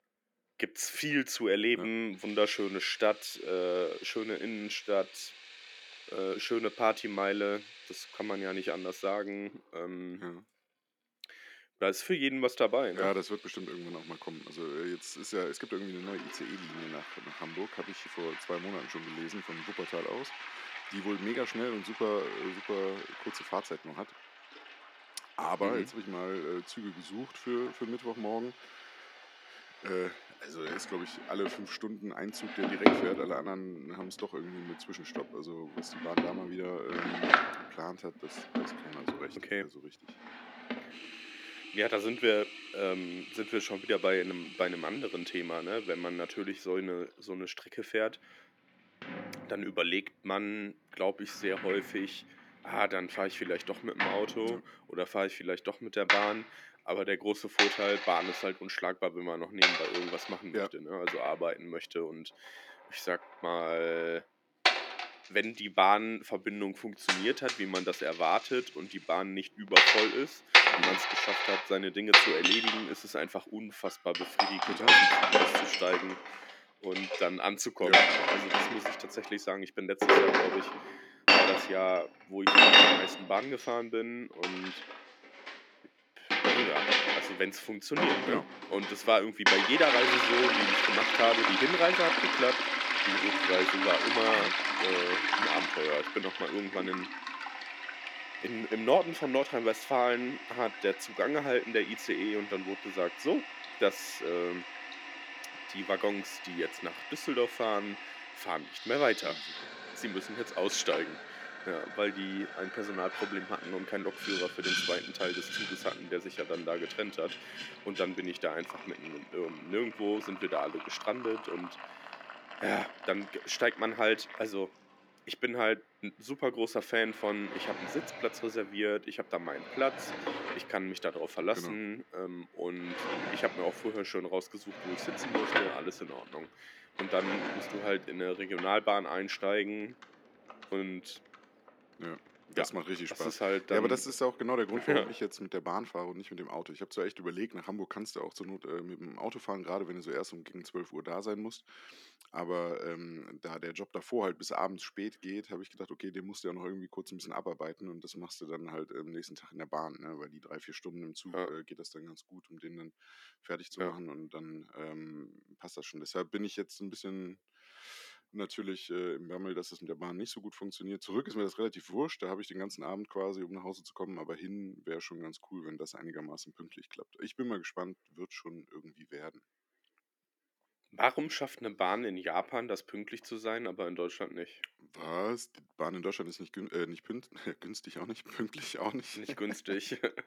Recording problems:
thin; very slightly; fading below 250 Hz
household noises; very loud; until 2:25; 7 dB above the speech

